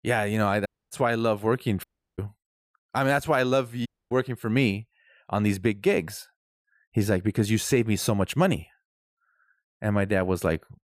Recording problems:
audio cutting out; at 0.5 s, at 2 s and at 4 s

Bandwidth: 15 kHz